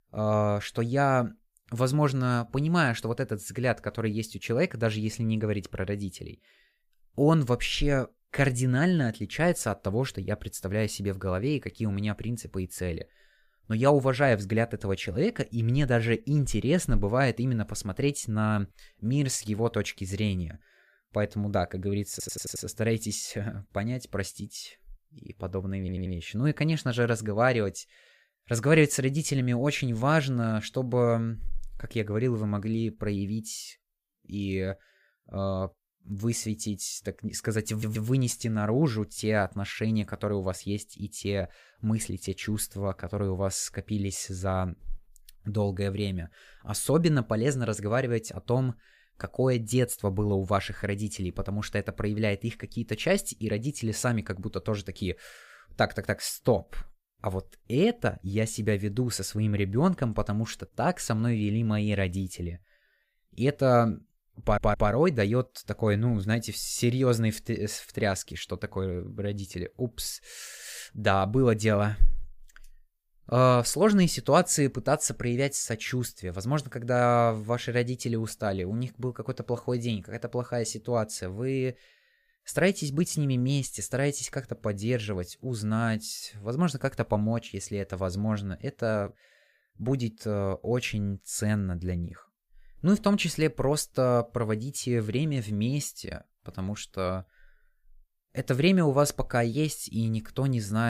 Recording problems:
audio stuttering; 4 times, first at 22 s
abrupt cut into speech; at the end

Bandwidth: 15 kHz